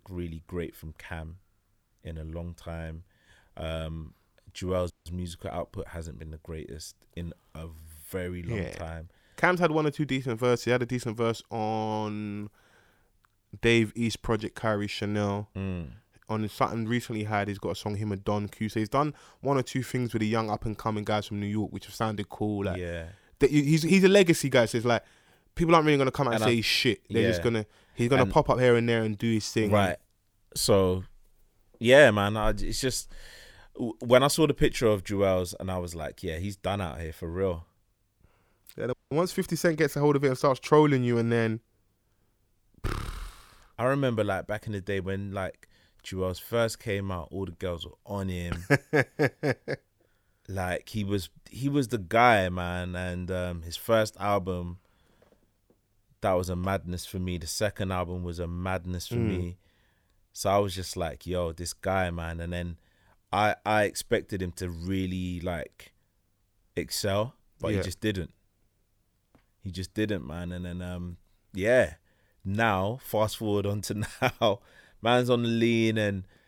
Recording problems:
audio cutting out; at 5 s and at 39 s

